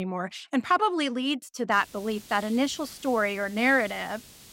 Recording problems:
hiss; noticeable; from 1.5 s on; 20 dB below the speech
abrupt cut into speech; at the start

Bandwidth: 16 kHz